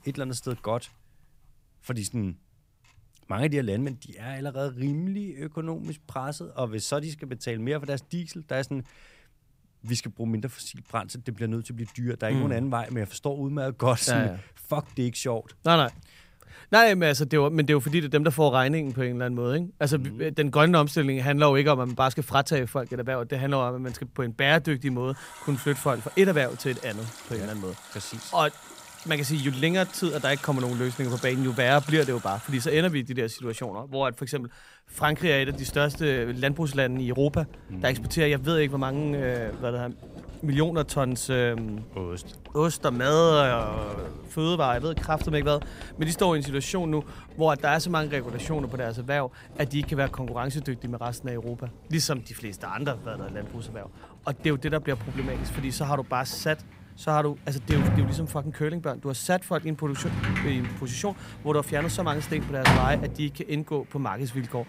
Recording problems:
household noises; loud; throughout; 9 dB below the speech

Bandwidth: 15.5 kHz